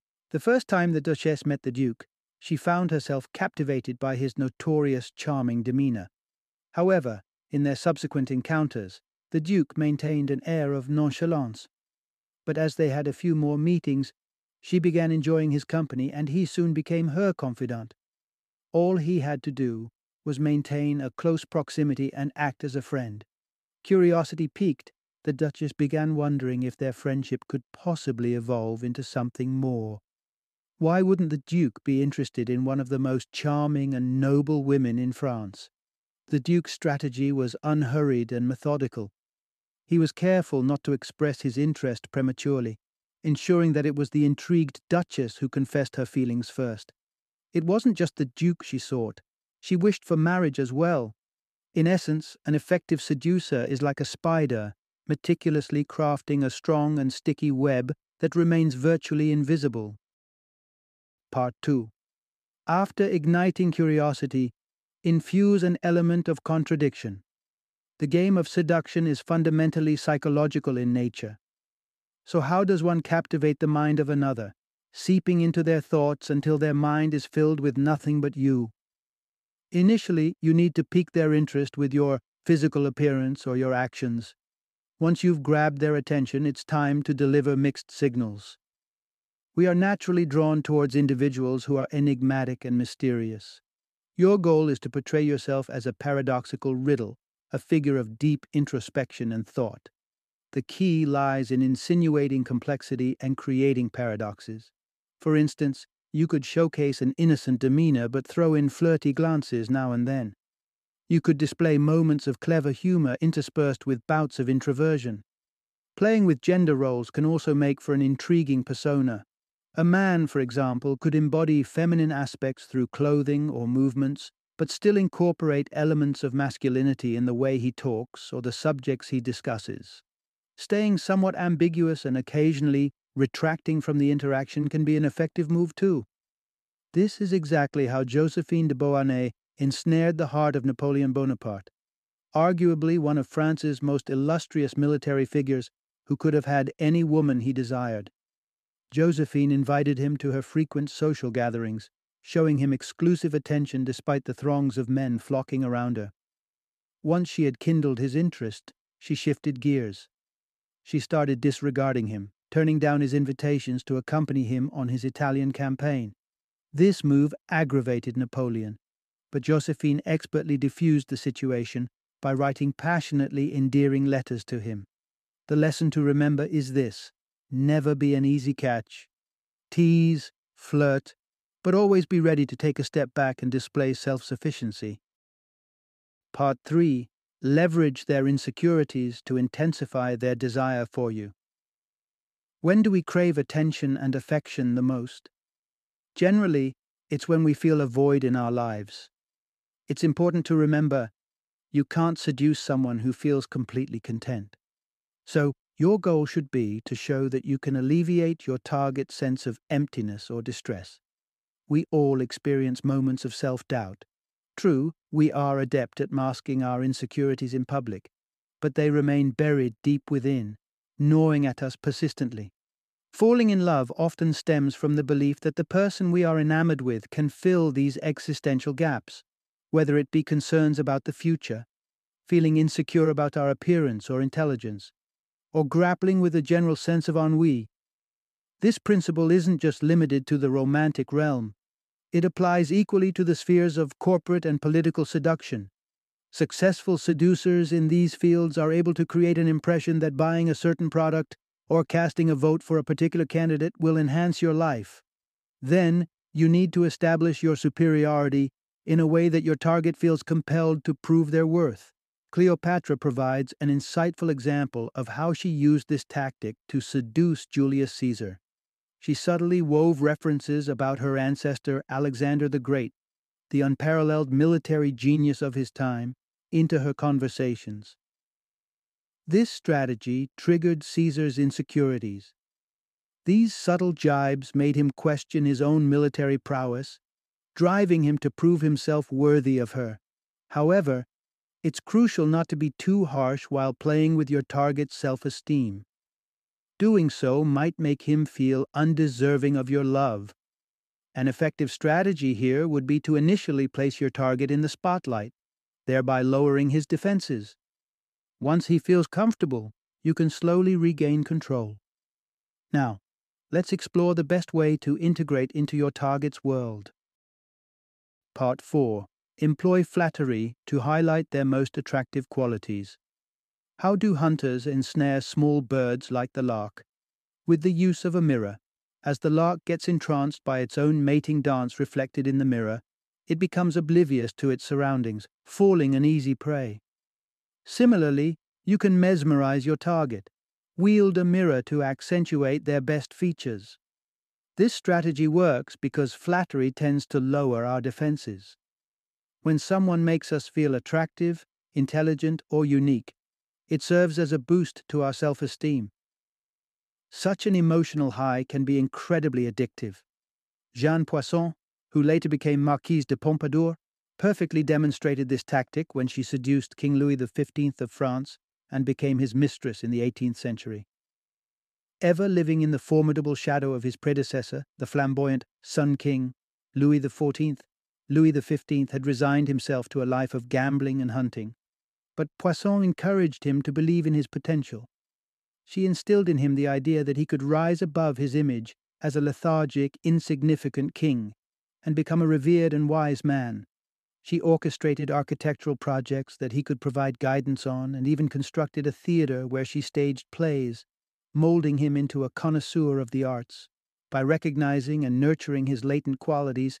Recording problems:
none

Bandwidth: 14.5 kHz